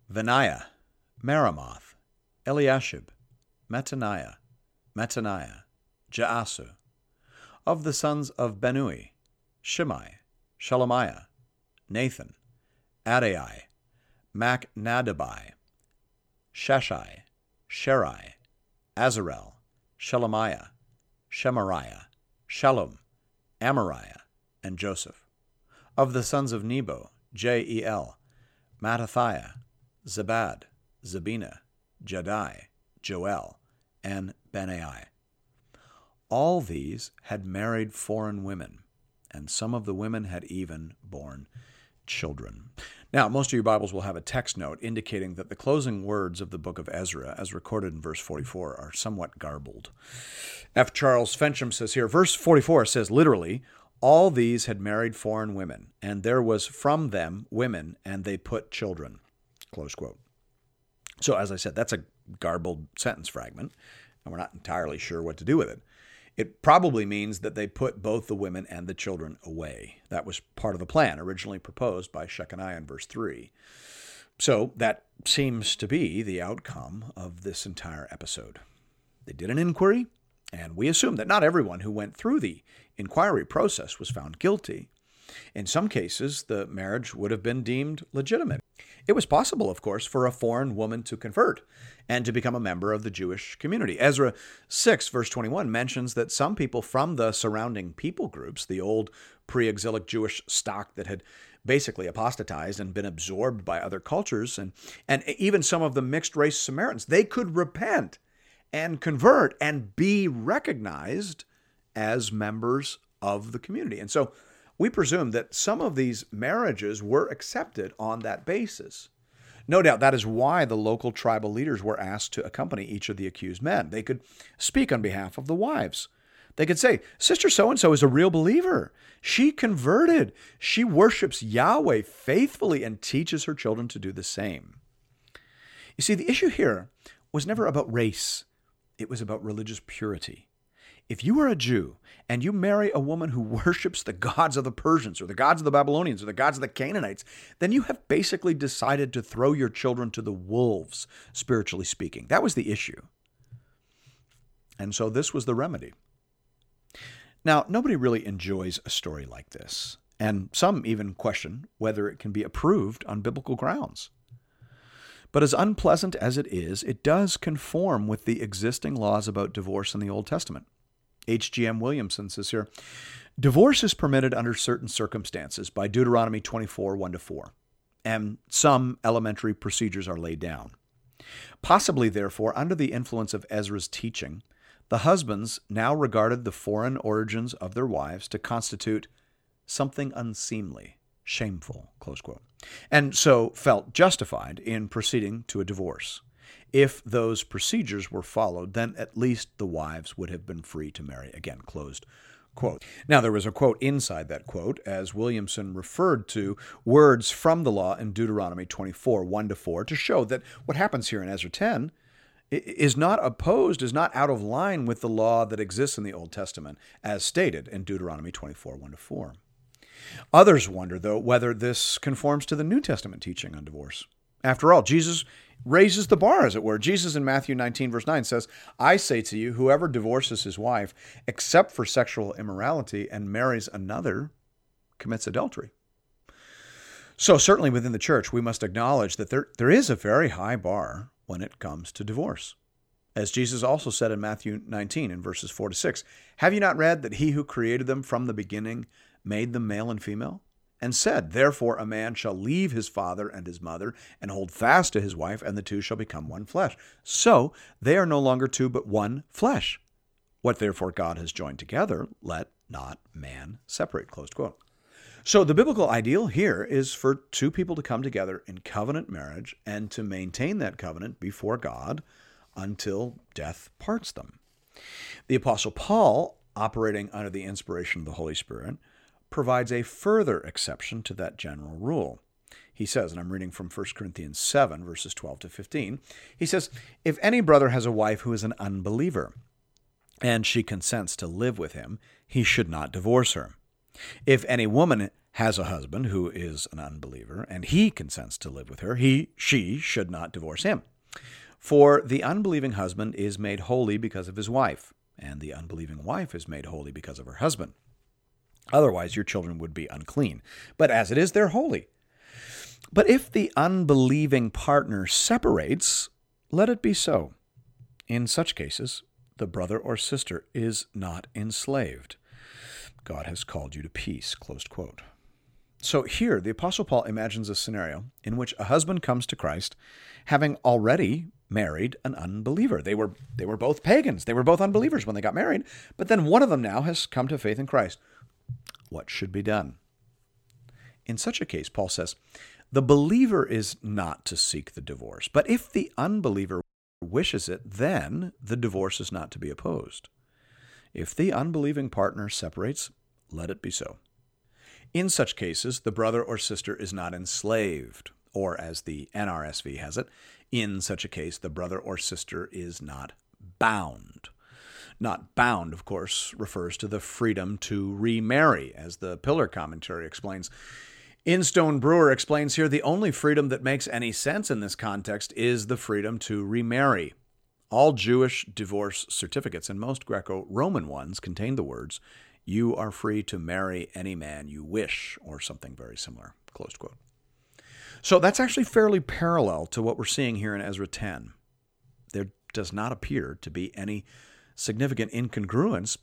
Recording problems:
audio cutting out; at 5:47

